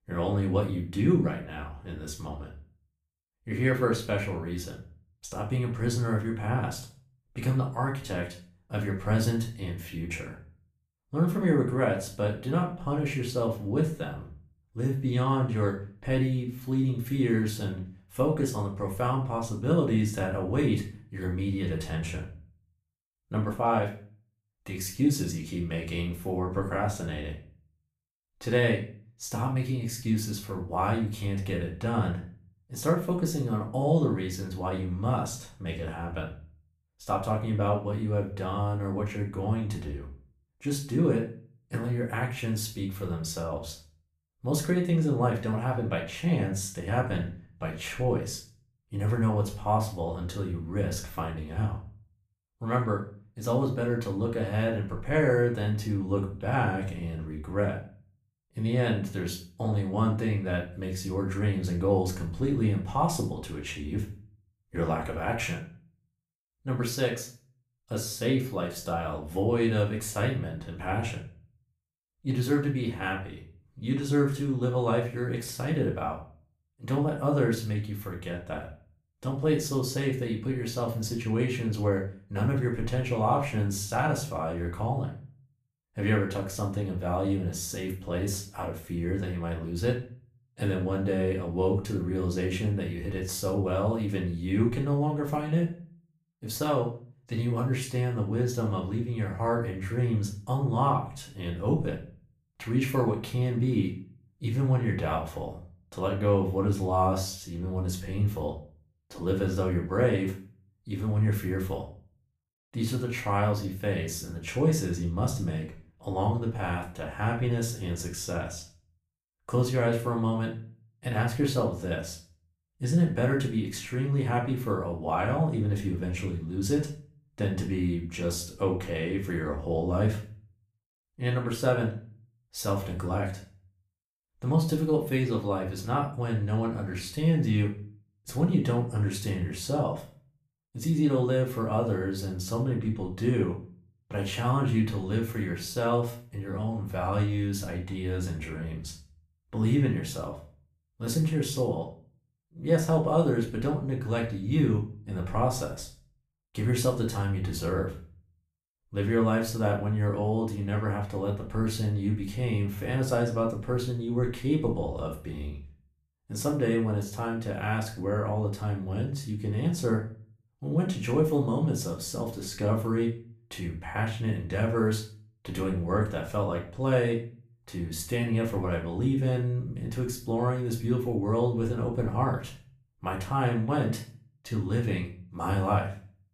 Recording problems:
off-mic speech; far
room echo; slight; dies away in 0.4 s

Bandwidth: 14.5 kHz